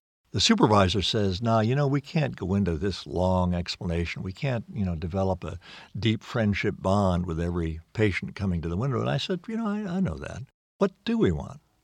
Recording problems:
none

